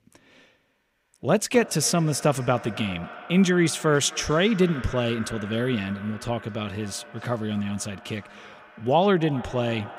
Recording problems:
echo of what is said; noticeable; throughout; 260 ms later, 15 dB below the speech

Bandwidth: 15.5 kHz